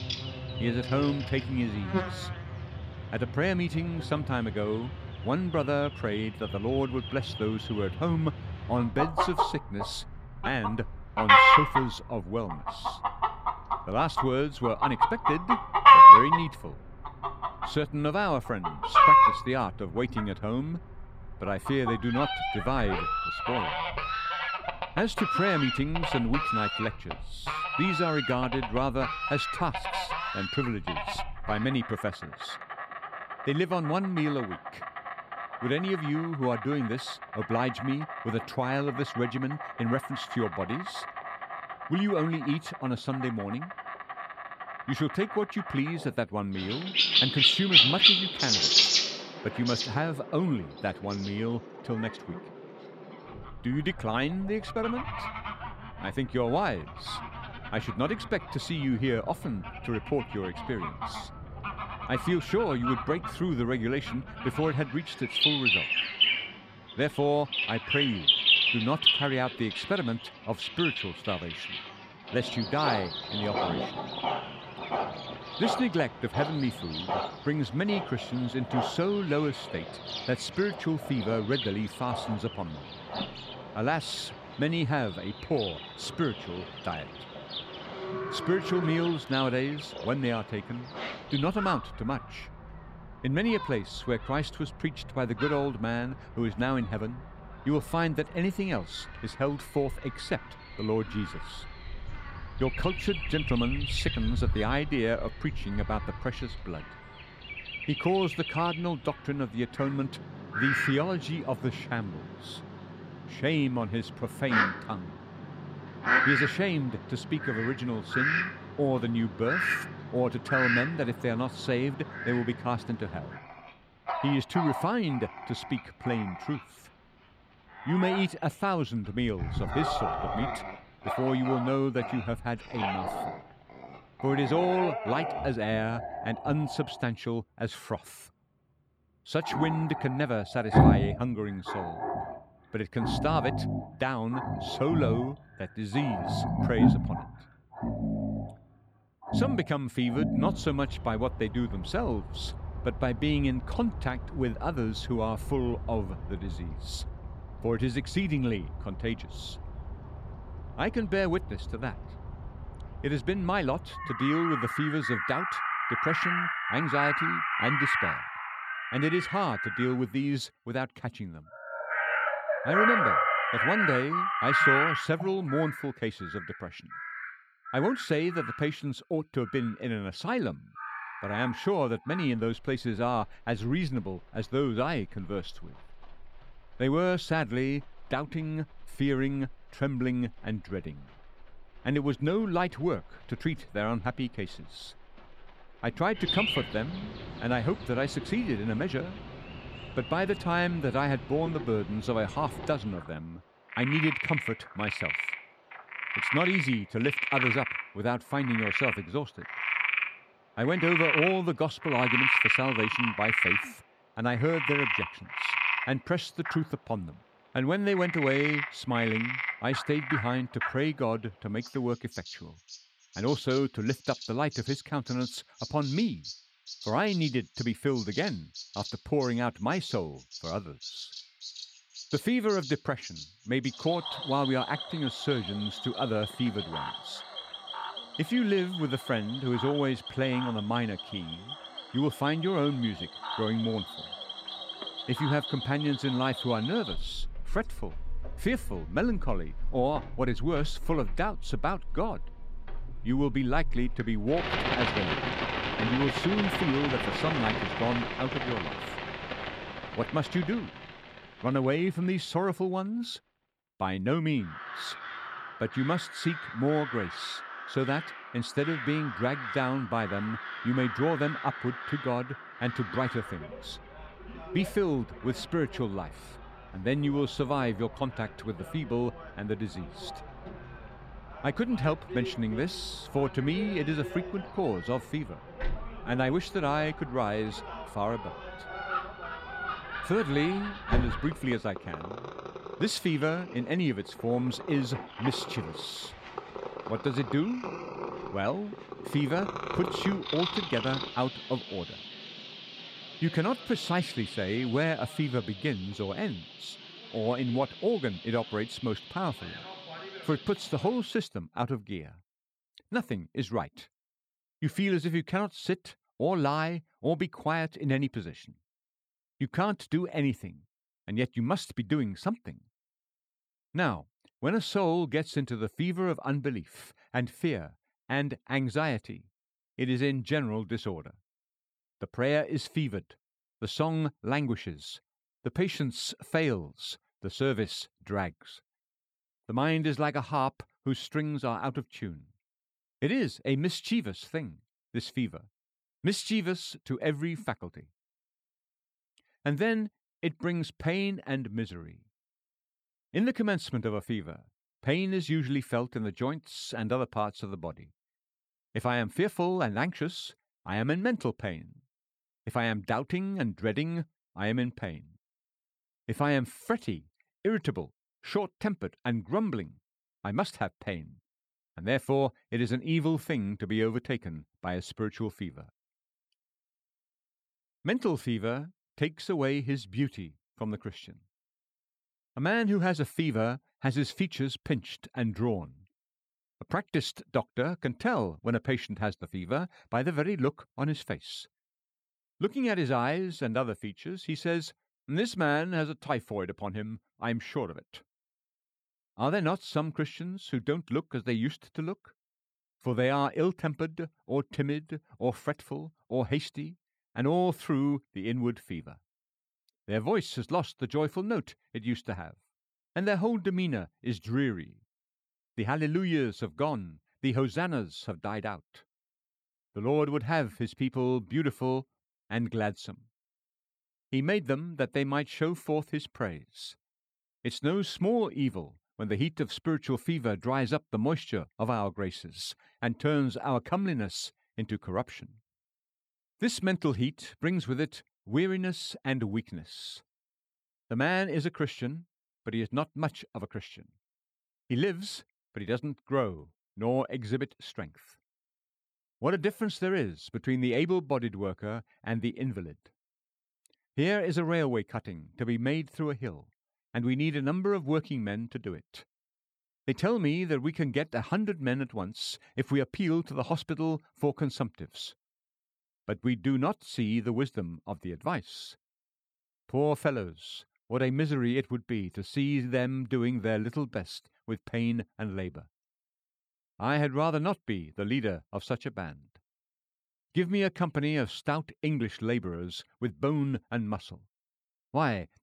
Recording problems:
animal sounds; very loud; until 5:11; 2 dB above the speech

